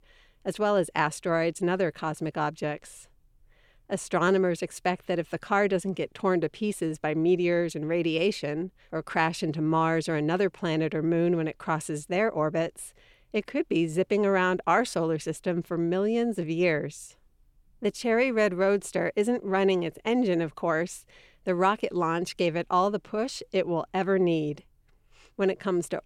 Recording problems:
none

